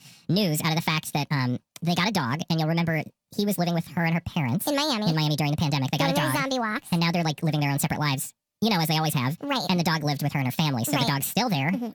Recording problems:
wrong speed and pitch; too fast and too high; 1.6 times normal speed

